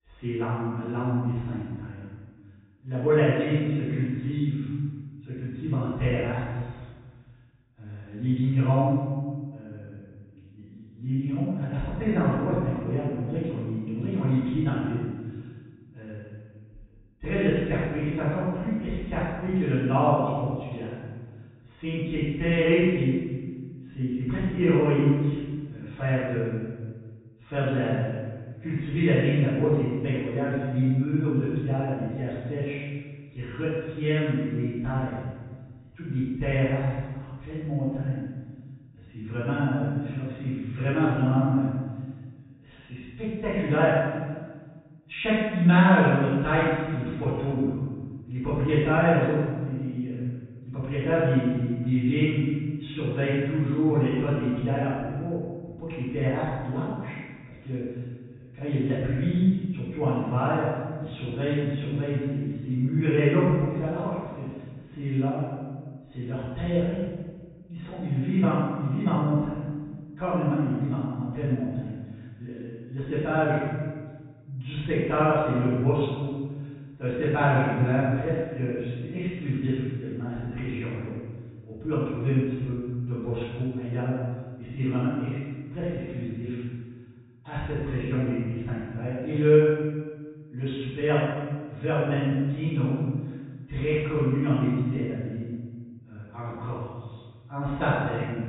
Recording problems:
room echo; strong; dies away in 1.4 s
off-mic speech; far
high frequencies cut off; severe; nothing above 4 kHz

